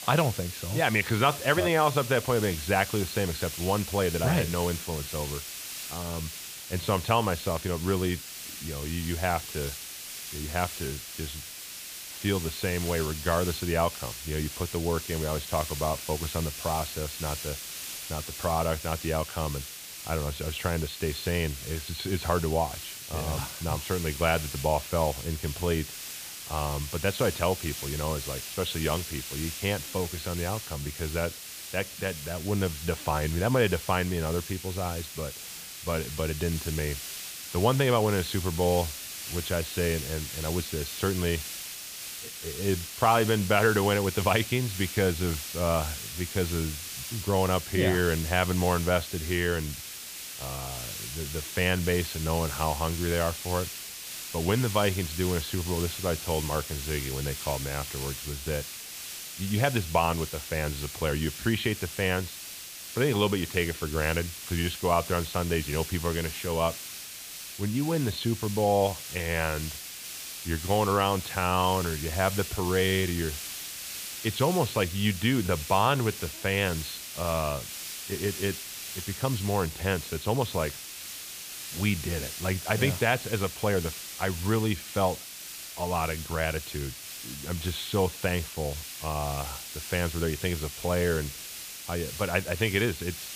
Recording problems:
high frequencies cut off; severe; nothing above 4.5 kHz
hiss; loud; throughout; 7 dB below the speech

